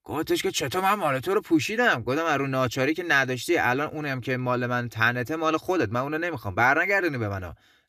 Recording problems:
none

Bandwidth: 14.5 kHz